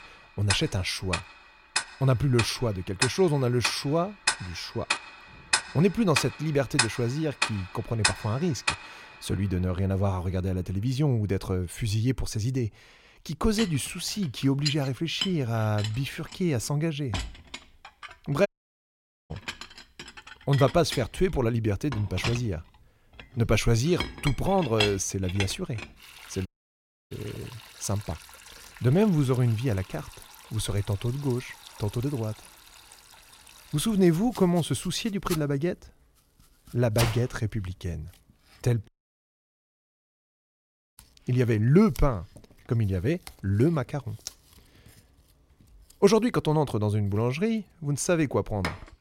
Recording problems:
household noises; loud; throughout; 6 dB below the speech
audio cutting out; at 18 s for 1 s, at 26 s for 0.5 s and at 39 s for 2 s

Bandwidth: 16 kHz